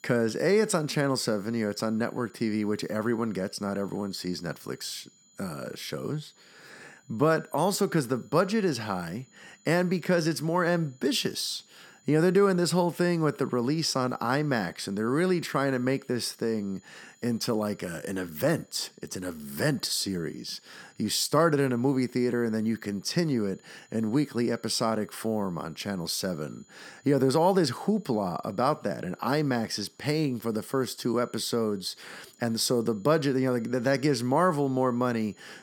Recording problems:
high-pitched whine; faint; throughout; 7 kHz, 30 dB below the speech

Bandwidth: 17.5 kHz